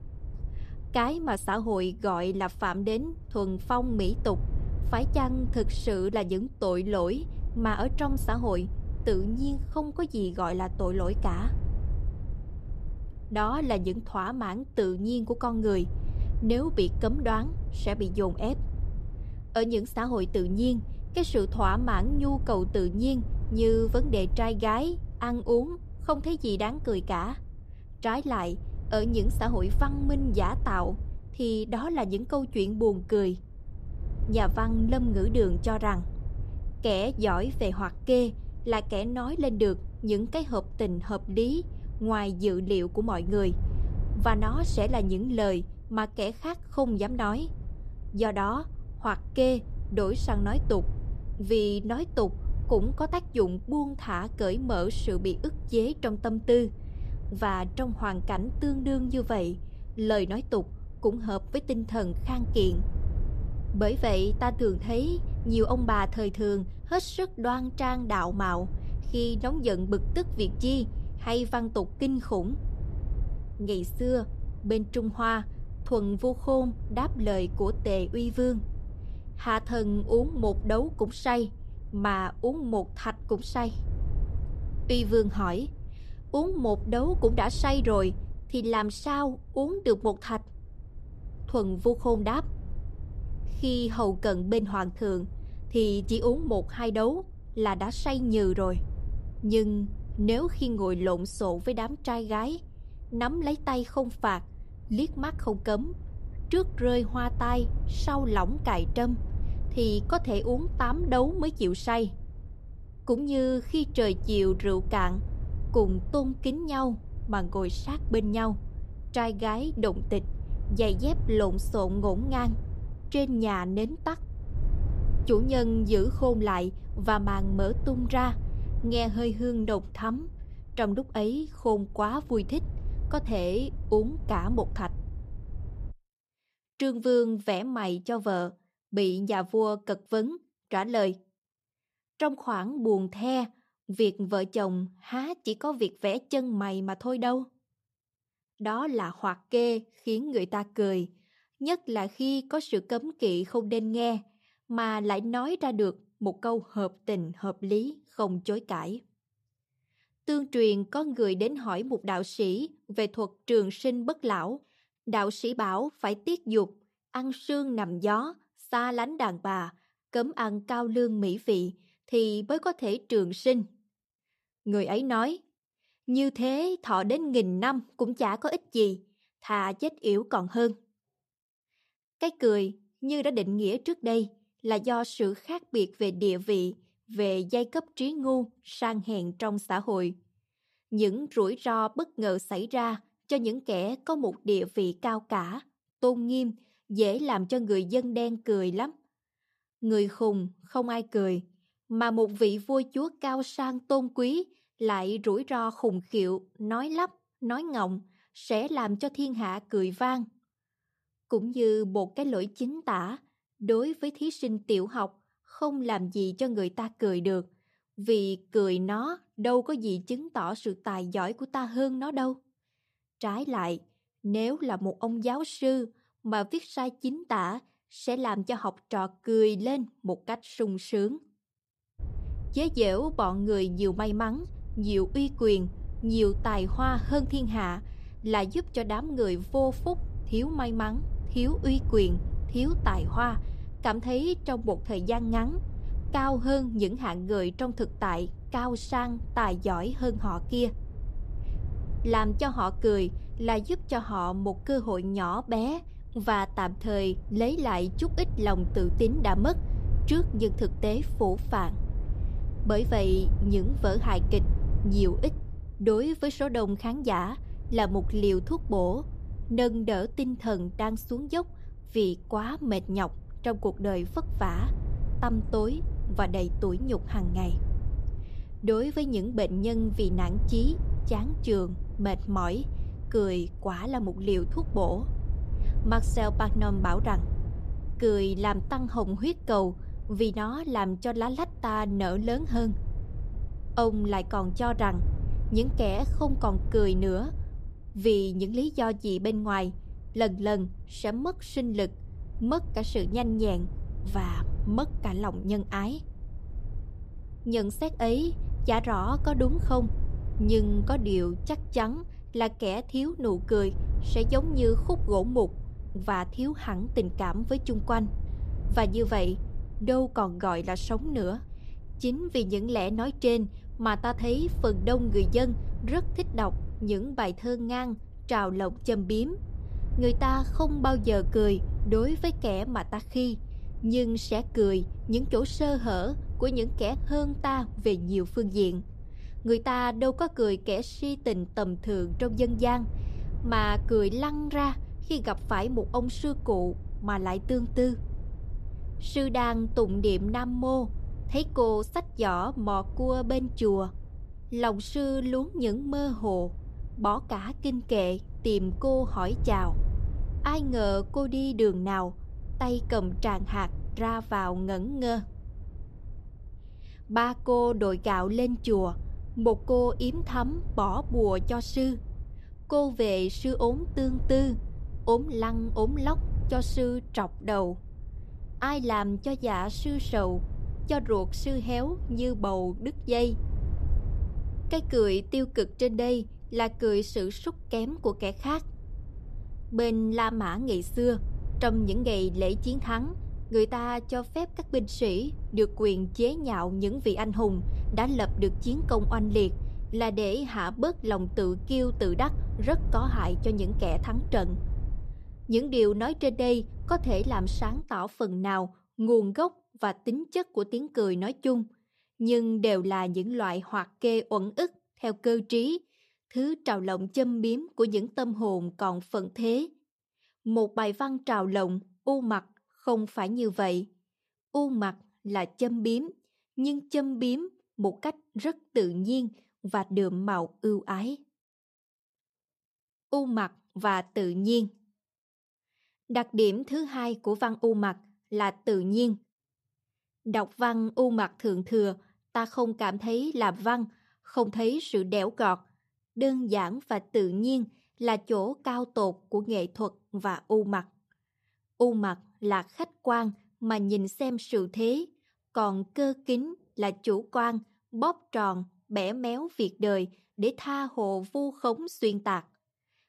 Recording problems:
wind noise on the microphone; occasional gusts; until 2:16 and from 3:52 to 6:48; 20 dB below the speech

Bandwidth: 14.5 kHz